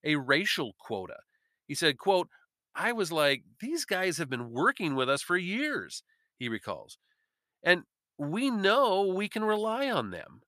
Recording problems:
none

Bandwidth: 14.5 kHz